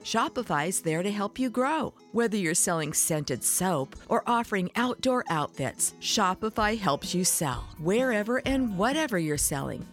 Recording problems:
background music; faint; throughout; 20 dB below the speech

